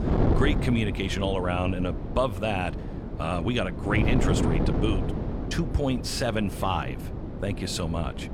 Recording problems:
wind noise on the microphone; heavy; 6 dB below the speech

